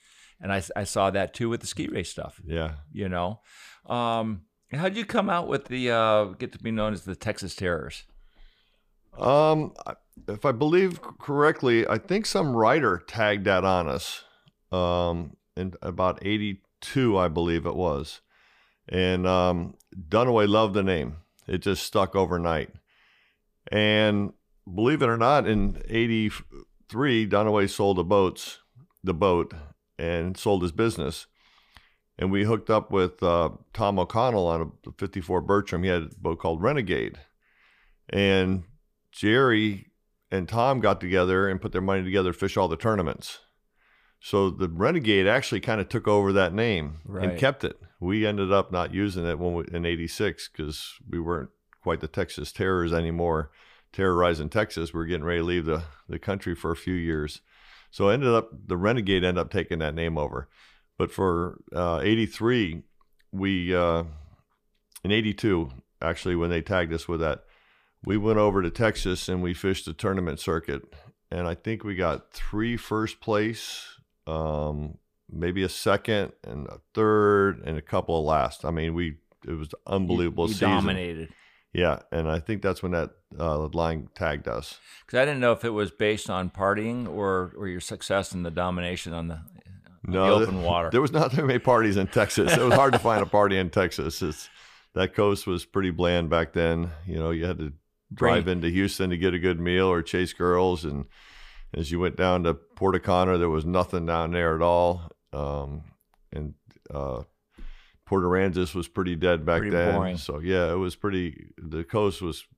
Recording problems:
none

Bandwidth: 15 kHz